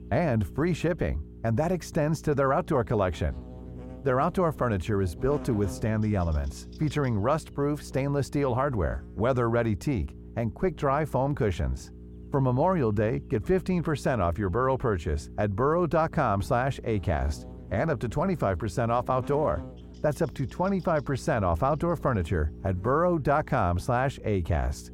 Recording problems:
muffled; very; fading above 2 kHz
electrical hum; faint; throughout; 60 Hz, 25 dB below the speech

